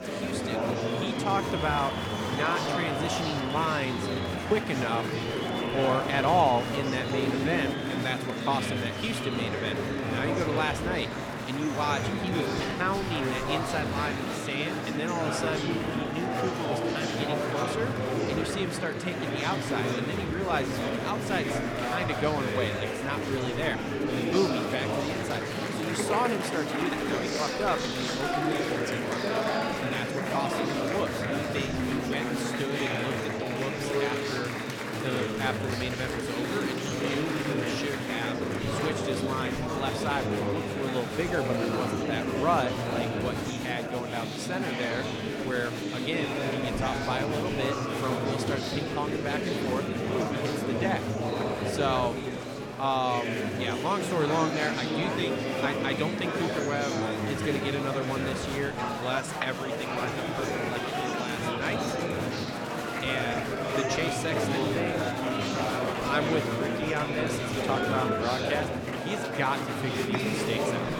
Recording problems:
murmuring crowd; very loud; throughout; 2 dB above the speech

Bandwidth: 18 kHz